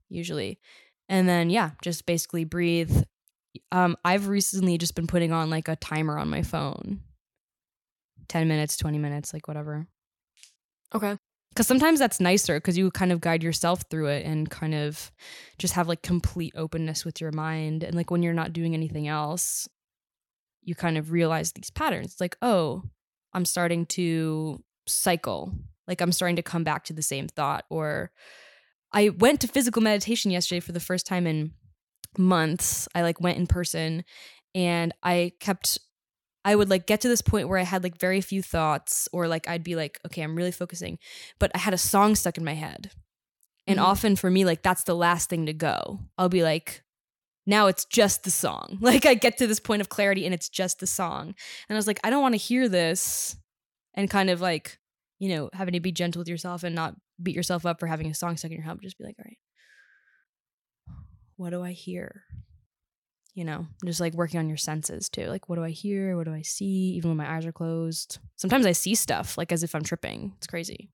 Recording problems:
none

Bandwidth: 17.5 kHz